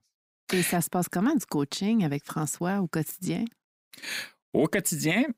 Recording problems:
none

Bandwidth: 15.5 kHz